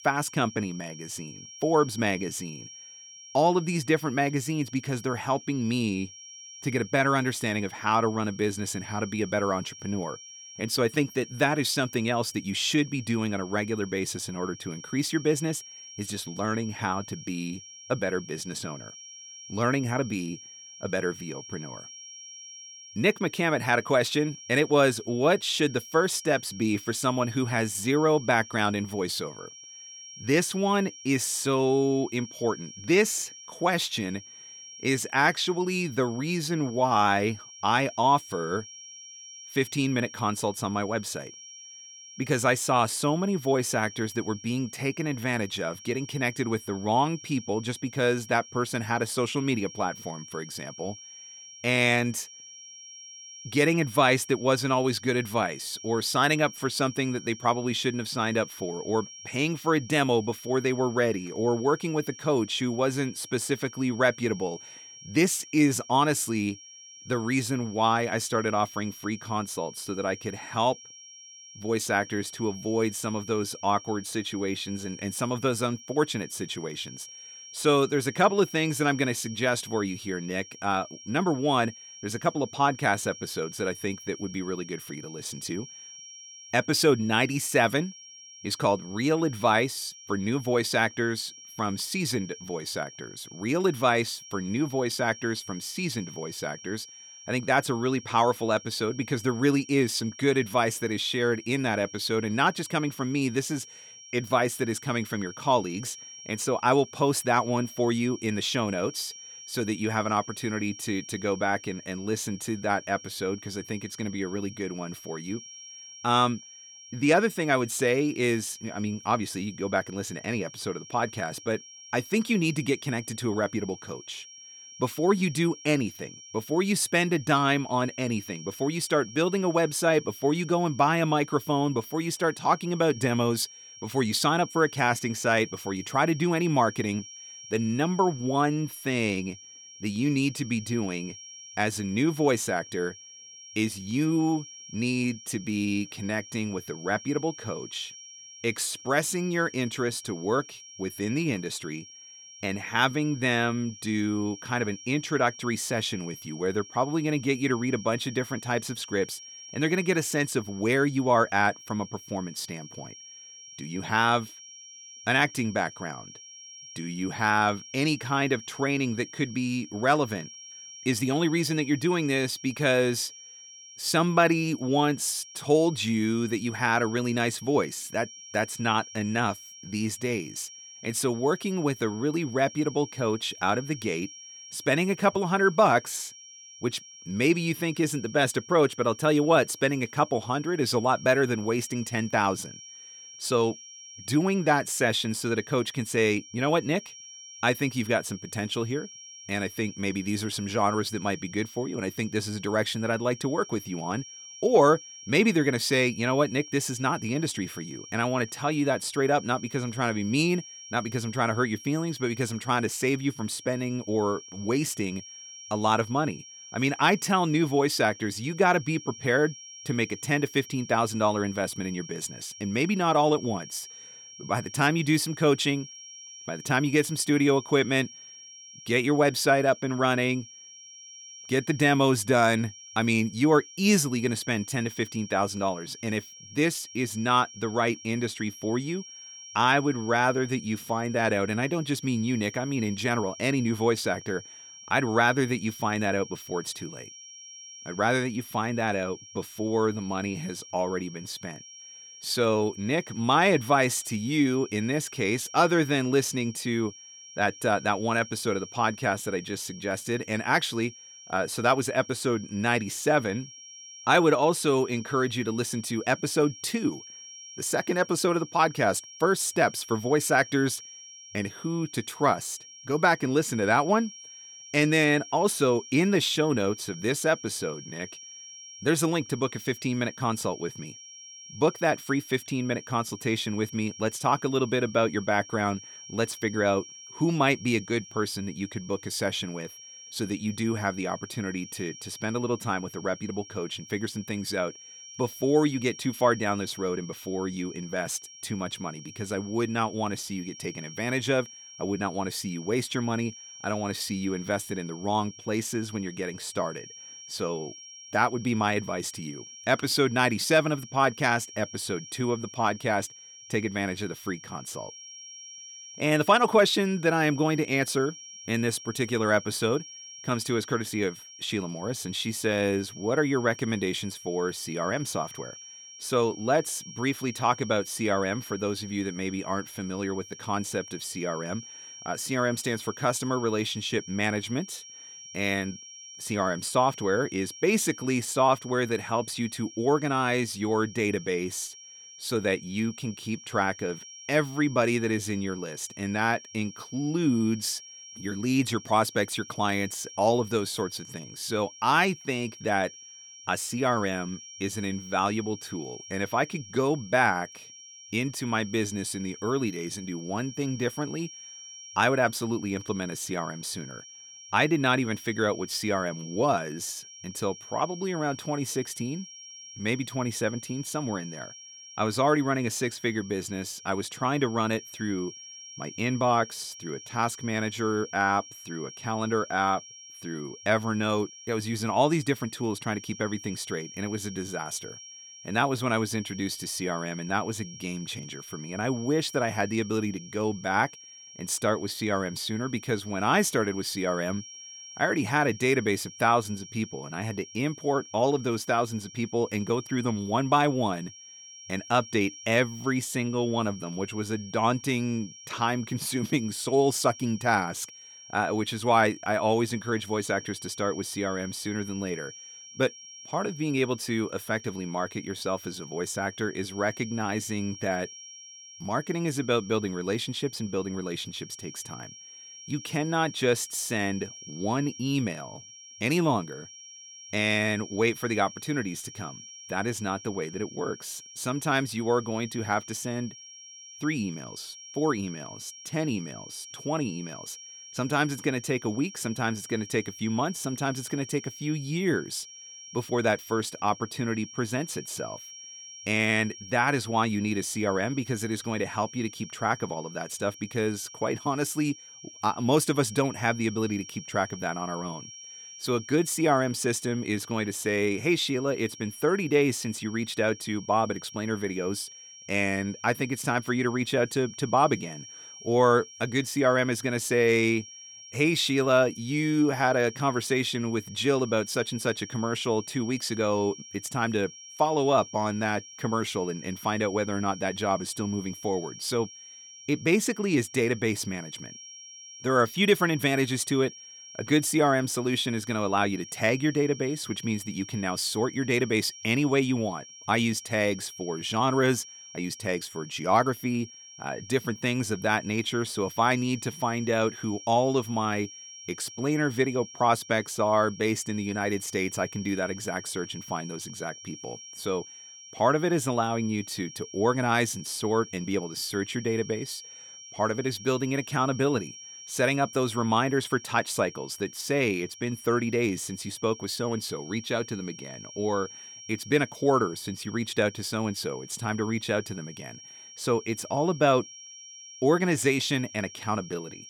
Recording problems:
high-pitched whine; noticeable; throughout; 5.5 kHz, 15 dB below the speech

